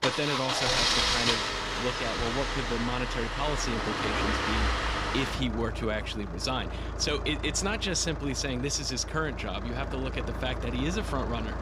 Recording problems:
traffic noise; very loud; throughout; 1 dB above the speech
dog barking; noticeable; at 0.5 s; peak 4 dB below the speech

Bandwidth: 15 kHz